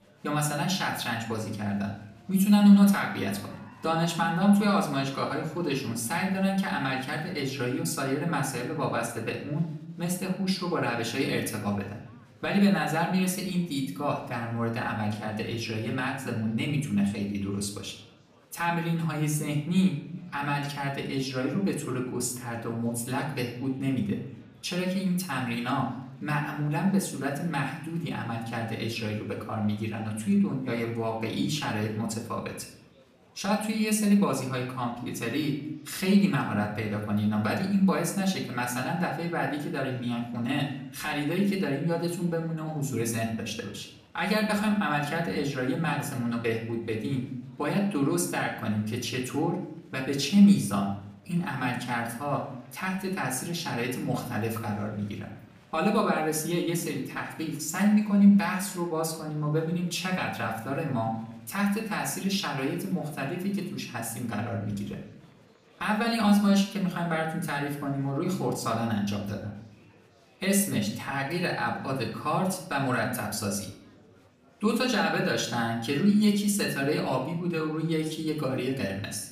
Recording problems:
off-mic speech; far
room echo; slight; dies away in 0.6 s
murmuring crowd; faint; throughout; 30 dB below the speech

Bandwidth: 15 kHz